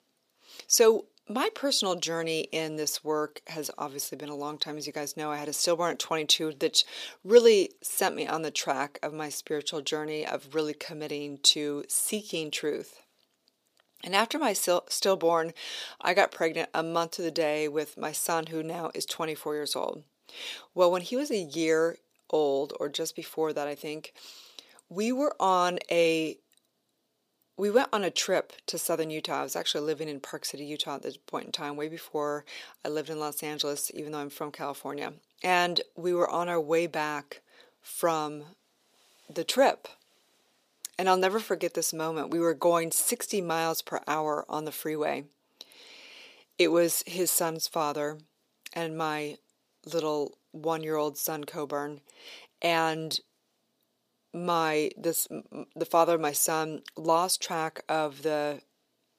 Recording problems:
thin; very; fading below 500 Hz

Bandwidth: 15 kHz